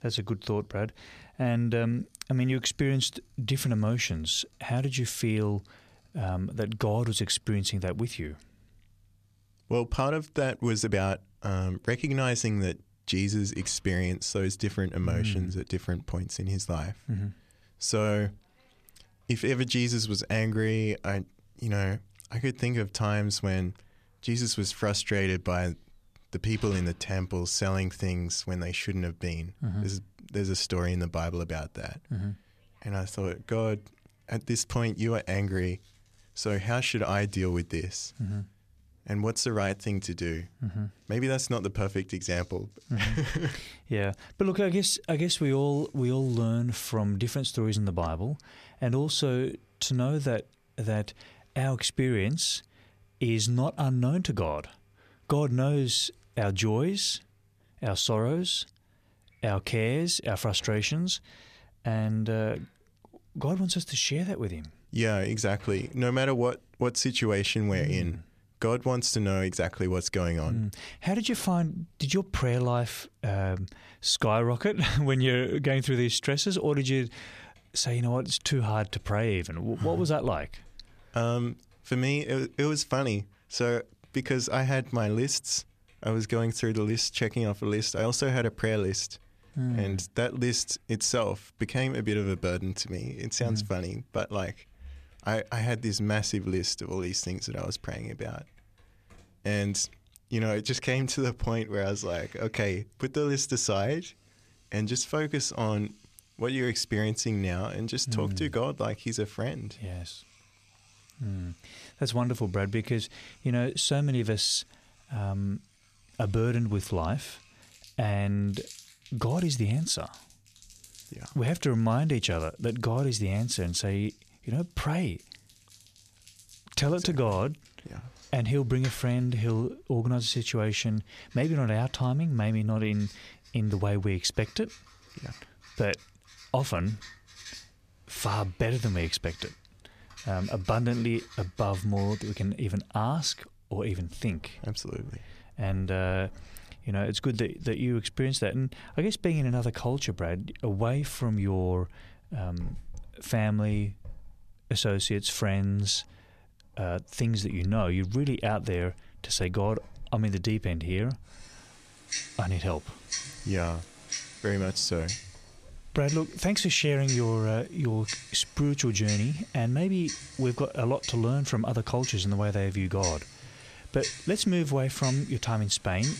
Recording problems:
household noises; noticeable; throughout; 15 dB below the speech

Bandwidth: 14.5 kHz